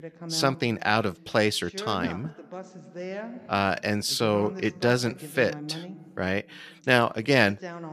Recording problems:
voice in the background; noticeable; throughout; 15 dB below the speech

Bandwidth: 14.5 kHz